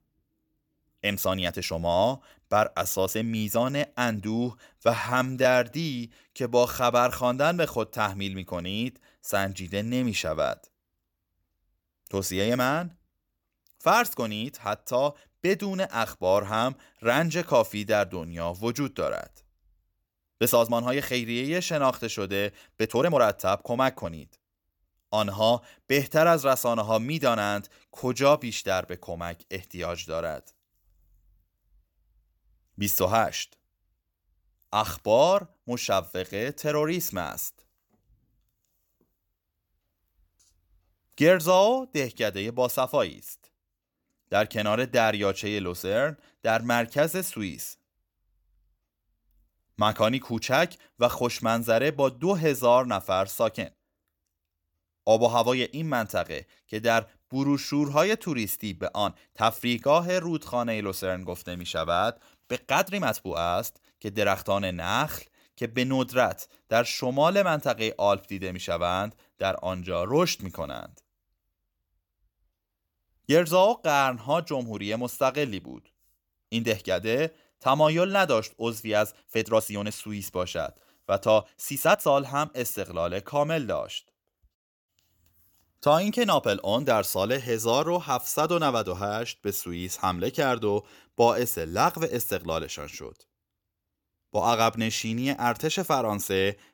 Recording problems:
uneven, jittery; strongly; from 1 s to 1:22

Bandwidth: 17.5 kHz